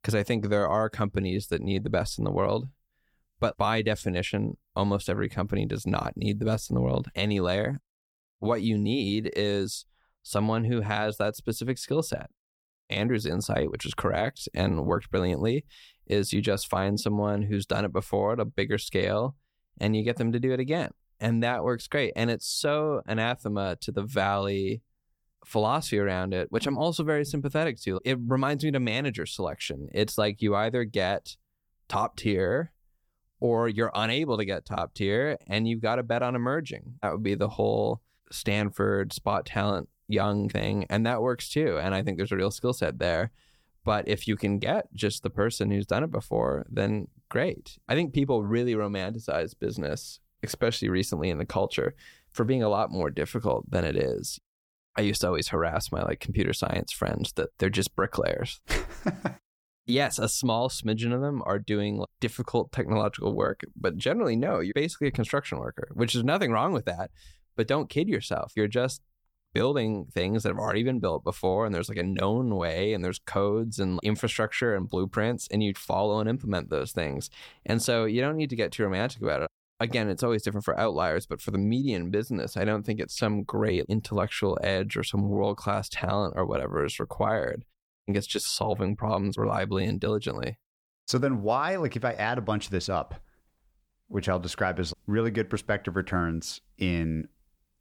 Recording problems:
none

